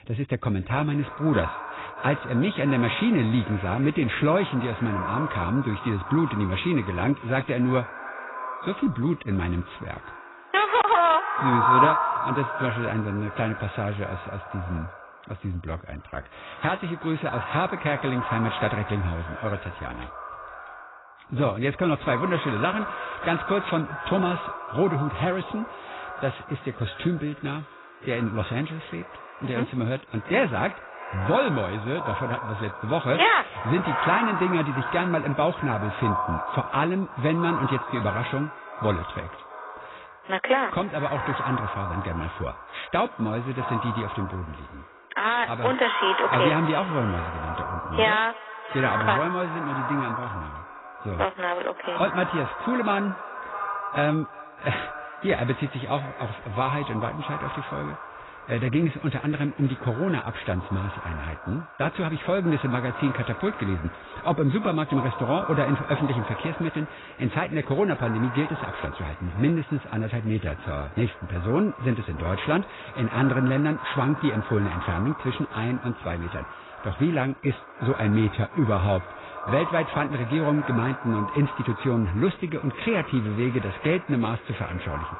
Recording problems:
echo of what is said; strong; throughout; 300 ms later, 7 dB below the speech
garbled, watery; badly; nothing above 4 kHz

